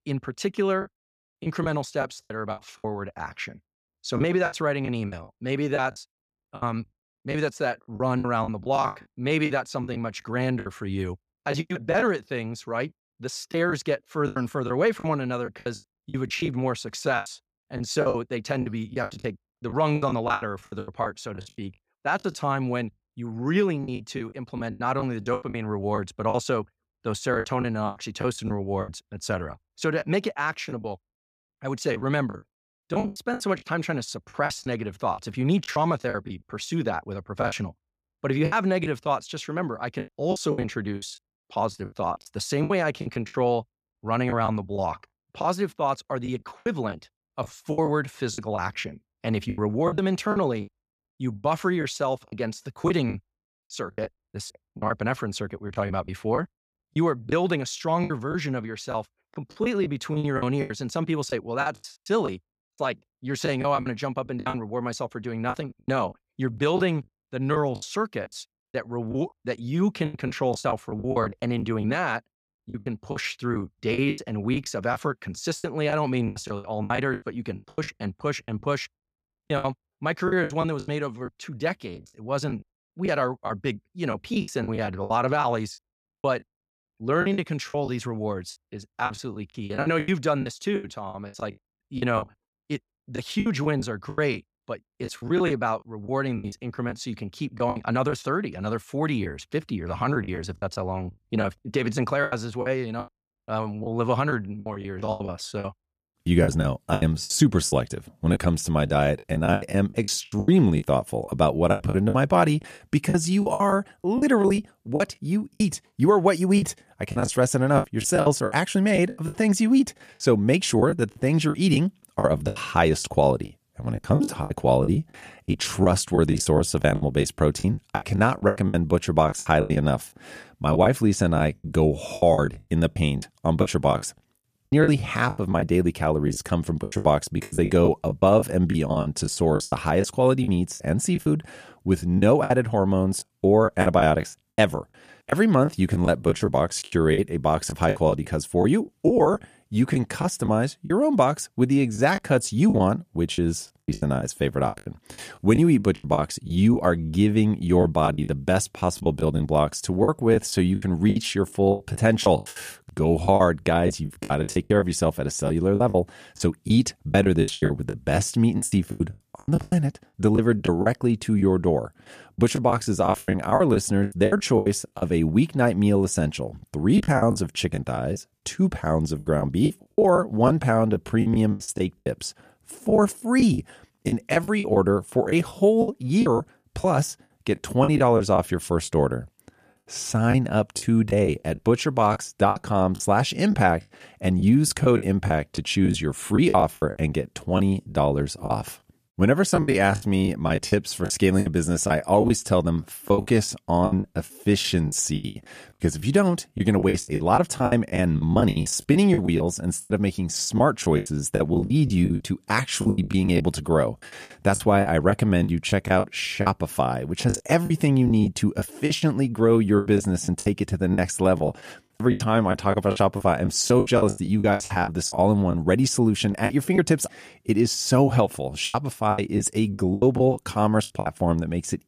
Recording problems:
choppy; very; 13% of the speech affected

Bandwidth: 14.5 kHz